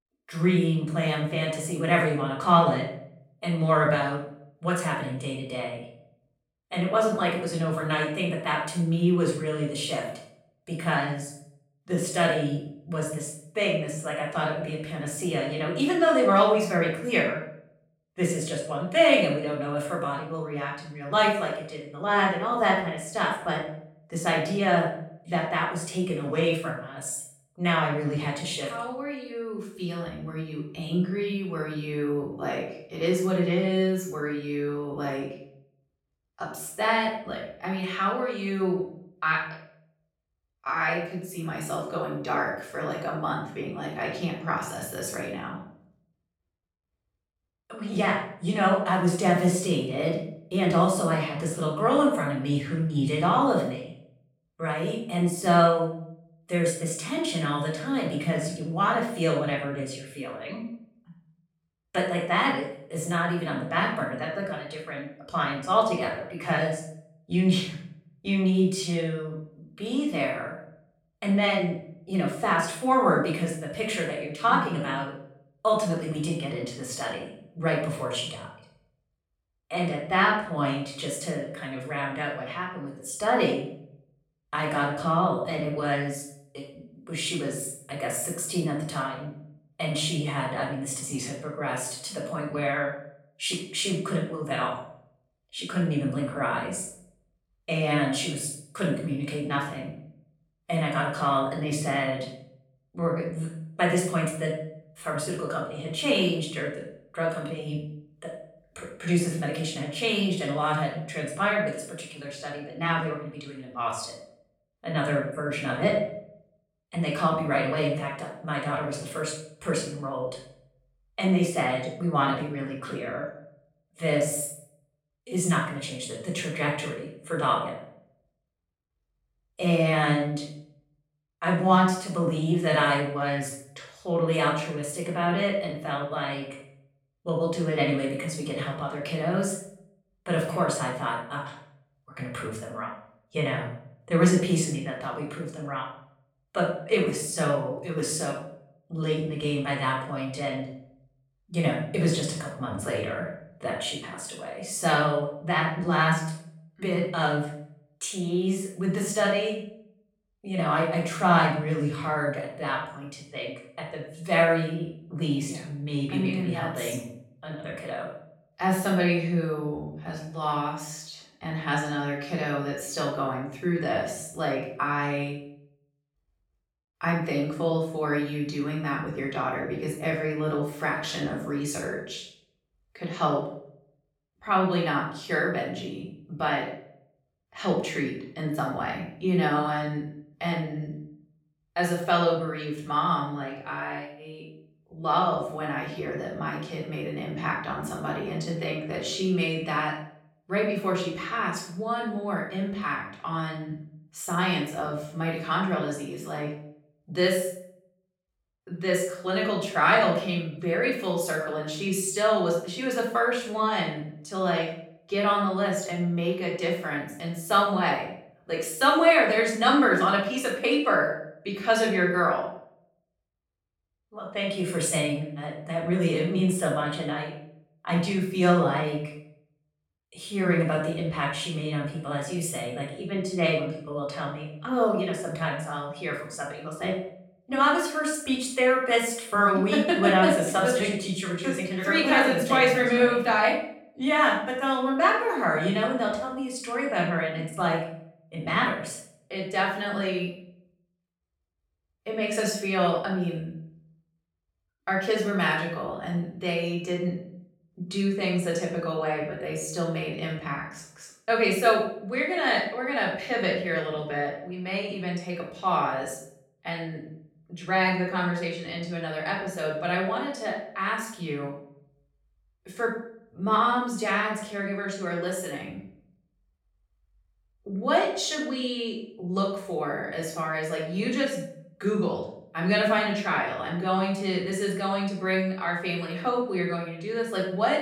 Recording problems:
off-mic speech; far
room echo; noticeable; dies away in 0.5 s

